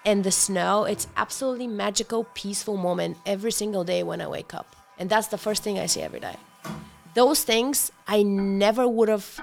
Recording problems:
household noises; faint; throughout; 25 dB below the speech

